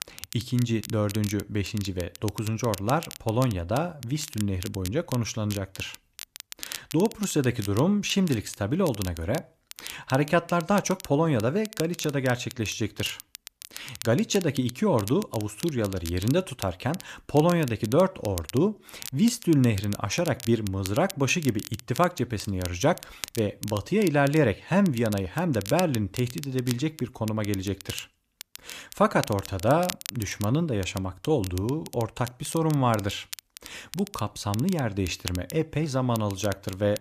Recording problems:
crackle, like an old record; noticeable; 15 dB below the speech

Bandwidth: 14.5 kHz